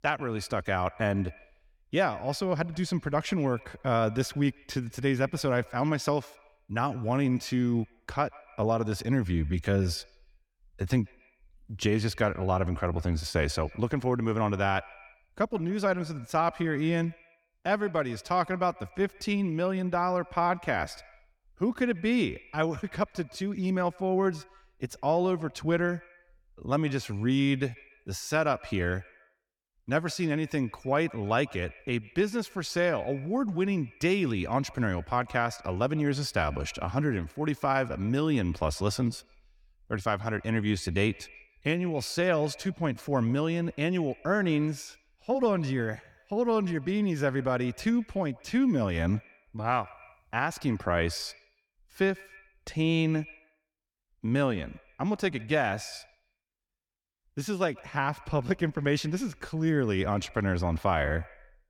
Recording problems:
echo of what is said; faint; throughout; 140 ms later, 25 dB below the speech

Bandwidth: 17.5 kHz